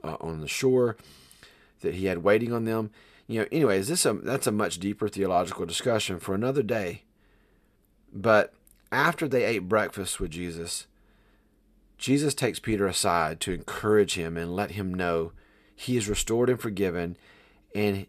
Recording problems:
none

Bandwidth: 14 kHz